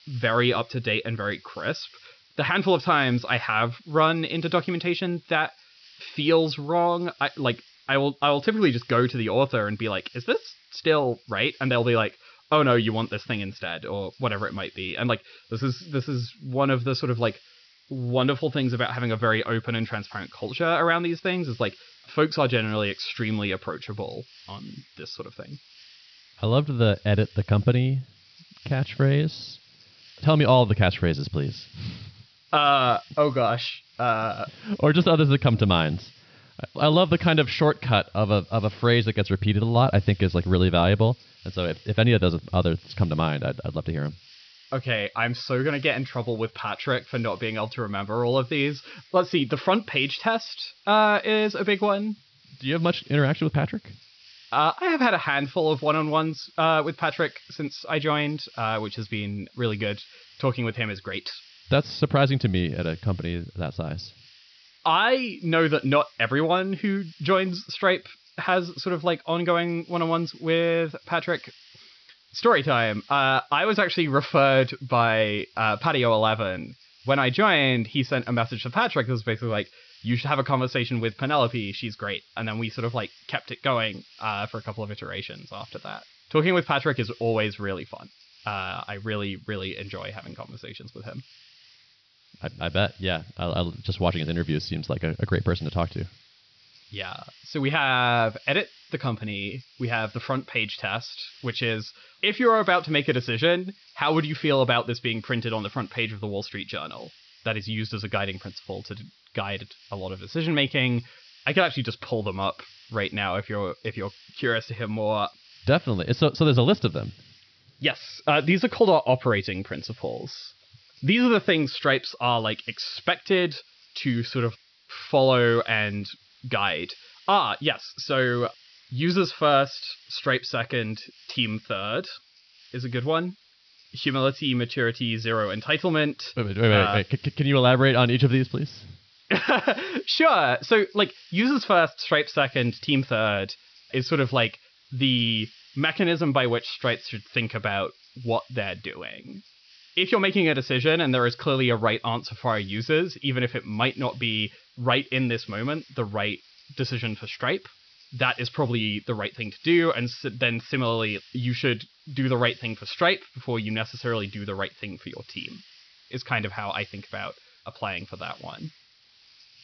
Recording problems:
high frequencies cut off; noticeable; nothing above 5.5 kHz
hiss; faint; throughout; 25 dB below the speech

